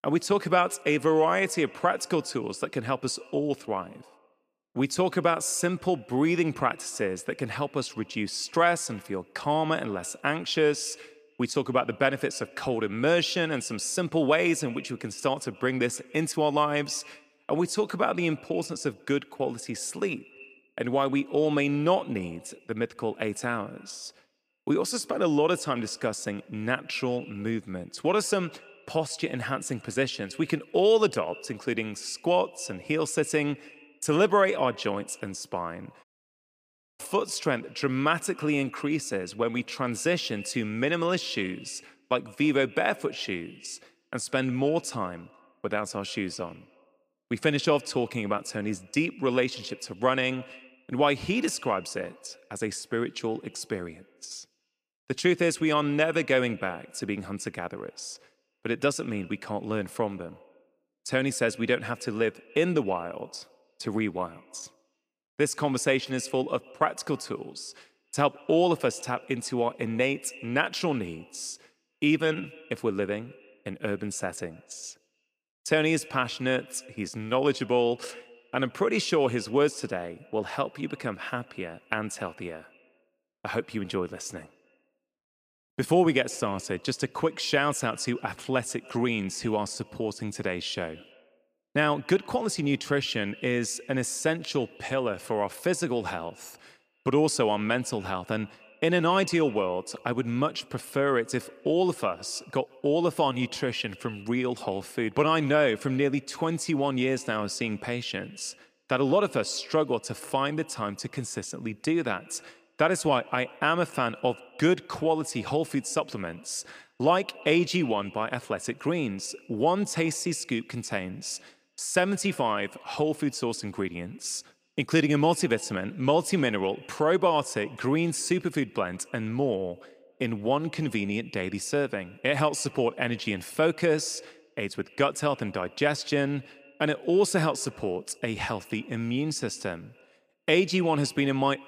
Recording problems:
echo of what is said; faint; throughout; 140 ms later, 25 dB below the speech
audio cutting out; at 36 s for 1 s

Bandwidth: 15 kHz